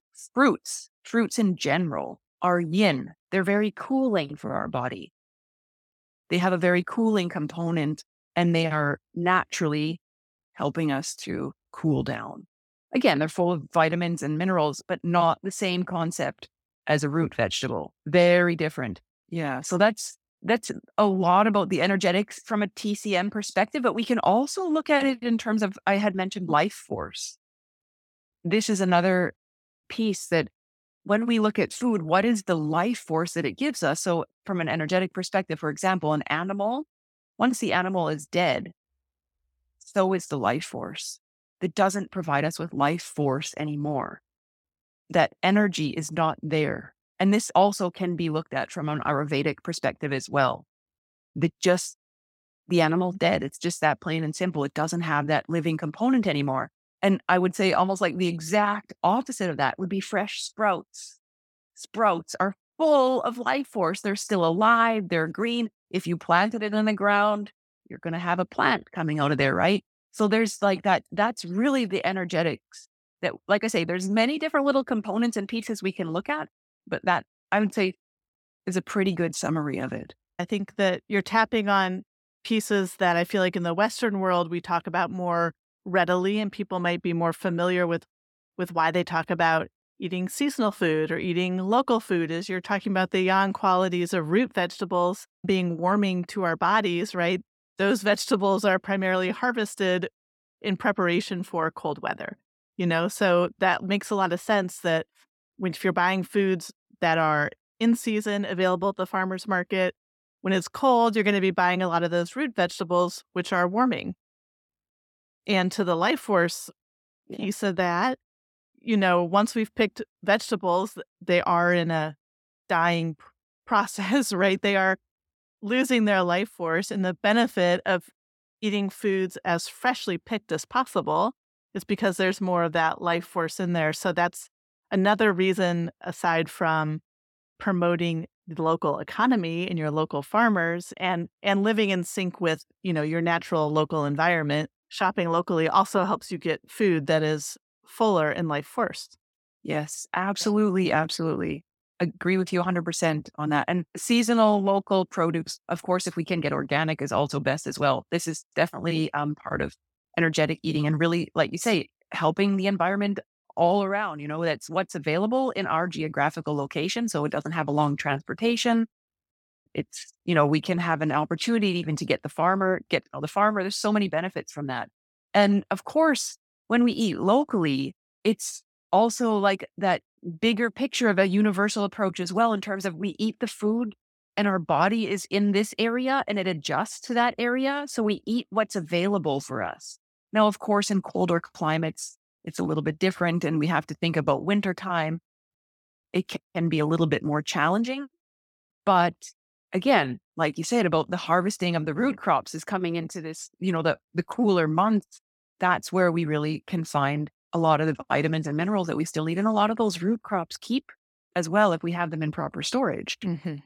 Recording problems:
none

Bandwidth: 17 kHz